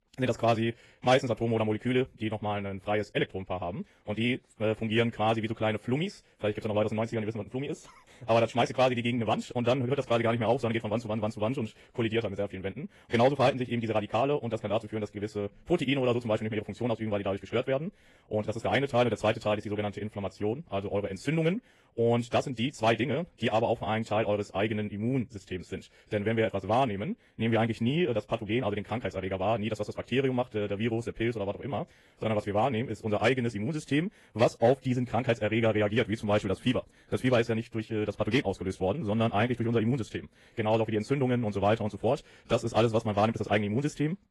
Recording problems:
wrong speed, natural pitch; too fast; 1.7 times normal speed
garbled, watery; slightly; nothing above 11.5 kHz

